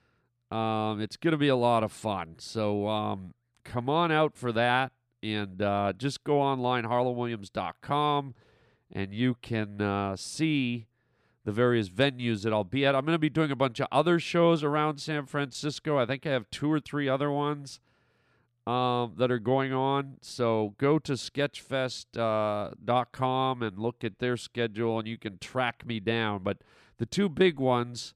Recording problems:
none

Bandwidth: 14.5 kHz